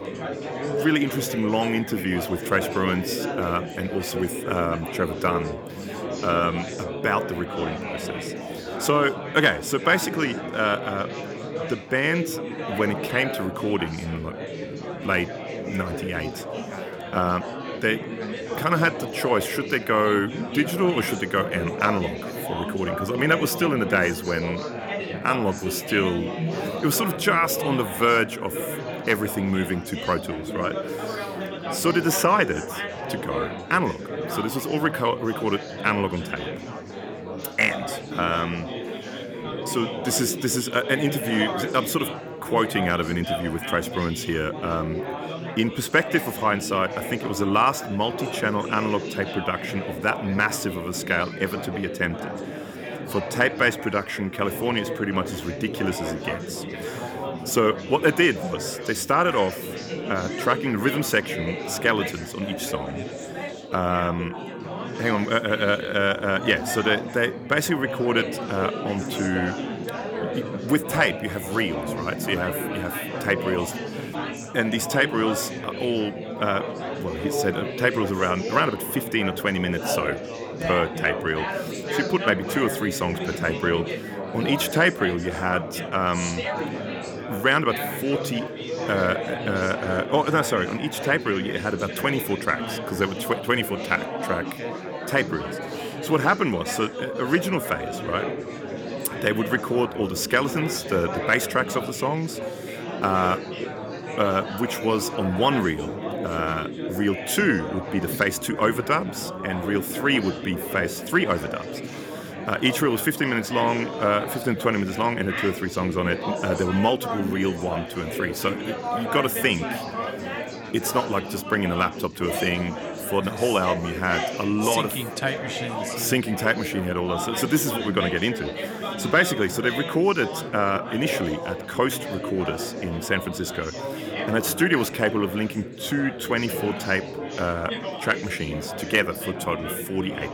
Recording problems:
chatter from many people; loud; throughout; 6 dB below the speech

